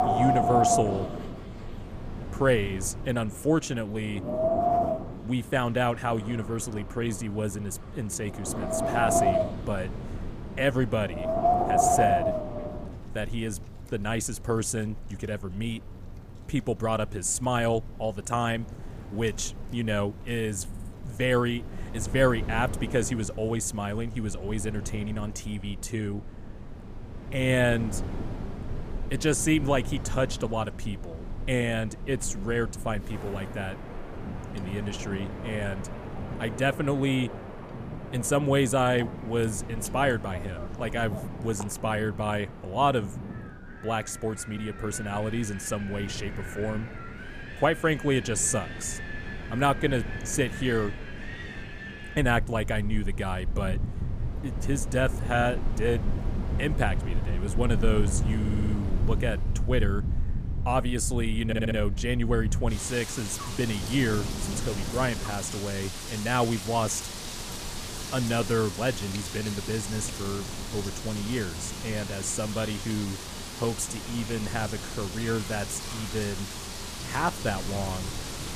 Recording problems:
wind in the background; loud; throughout; 4 dB below the speech
audio stuttering; at 21 s, at 58 s and at 1:01

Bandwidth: 15 kHz